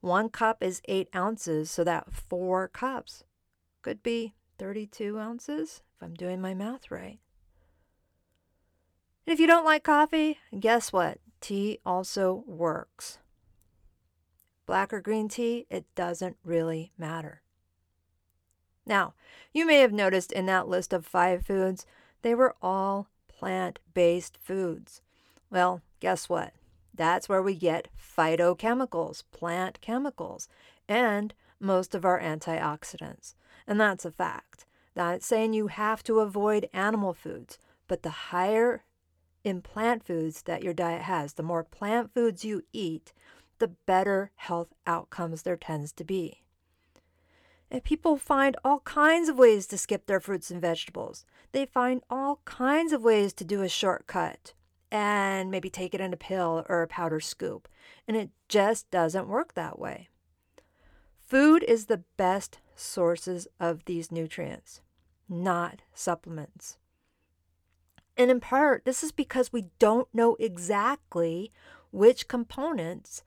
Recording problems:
none

